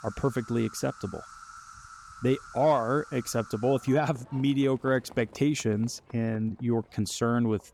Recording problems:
animal sounds; noticeable; throughout; 20 dB below the speech

